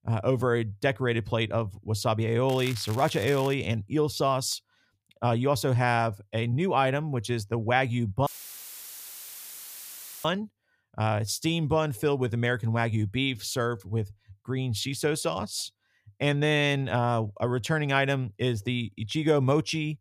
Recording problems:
crackling; noticeable; from 2.5 to 3.5 s; 15 dB below the speech
audio cutting out; filled with static; at 8.5 s for 2 s

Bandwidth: 15 kHz